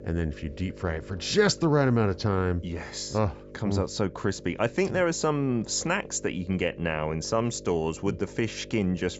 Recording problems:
high frequencies cut off; noticeable; nothing above 8 kHz
electrical hum; noticeable; throughout; 50 Hz, 20 dB below the speech

